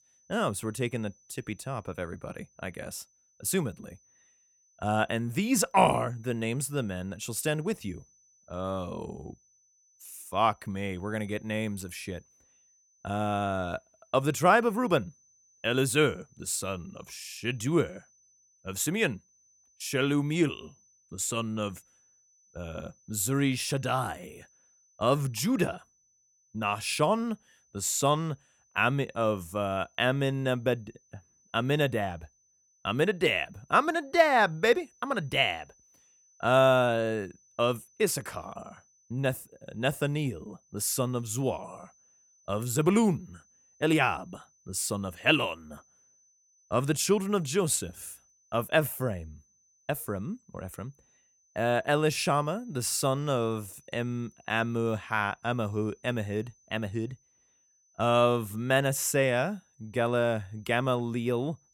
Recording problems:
high-pitched whine; faint; throughout; 6 kHz, 35 dB below the speech

